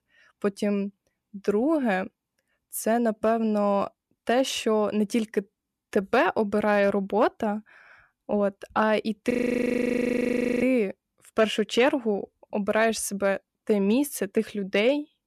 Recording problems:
audio freezing; at 9.5 s for 1.5 s

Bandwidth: 13.5 kHz